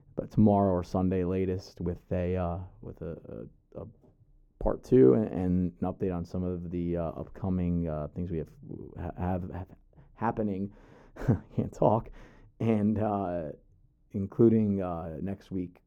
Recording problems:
muffled; very; fading above 1 kHz

